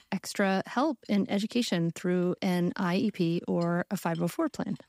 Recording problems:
household noises; faint; throughout; 30 dB below the speech

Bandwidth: 15.5 kHz